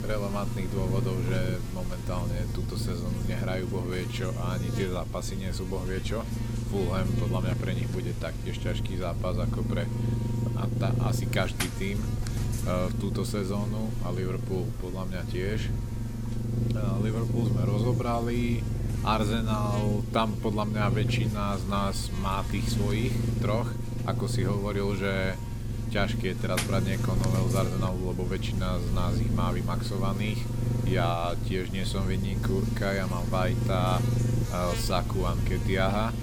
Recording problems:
low rumble; loud; throughout; 7 dB below the speech
electrical hum; very faint; throughout; 60 Hz, 10 dB below the speech

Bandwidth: 18 kHz